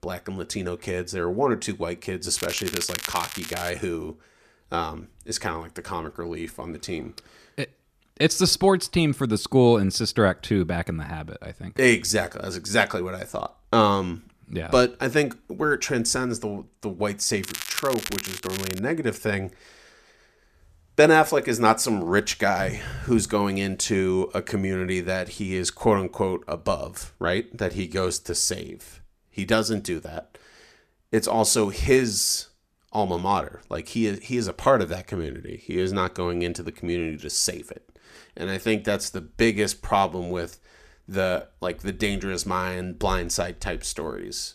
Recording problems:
crackling; loud; from 2.5 to 3.5 s and from 17 to 19 s; 7 dB below the speech

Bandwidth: 14.5 kHz